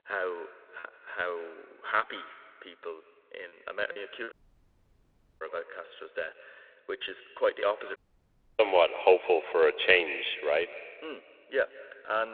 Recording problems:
echo of what is said; noticeable; throughout; 170 ms later, 15 dB below the speech
phone-call audio; nothing above 3.5 kHz
choppy; very; from 1 to 4.5 s; 8% of the speech affected
audio cutting out; at 4.5 s for 1 s and at 8 s for 0.5 s
abrupt cut into speech; at the end

